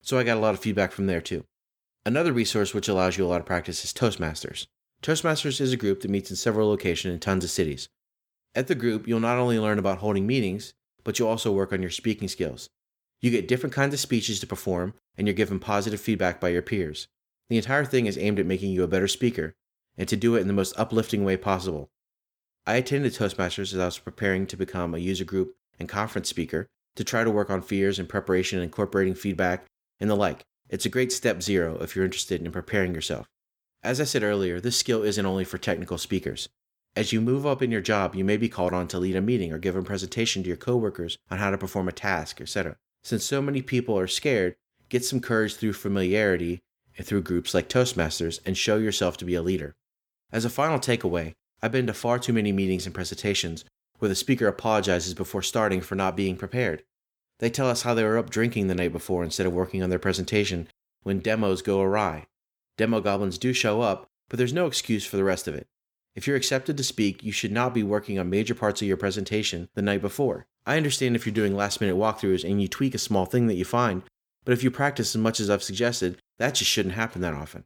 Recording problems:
none

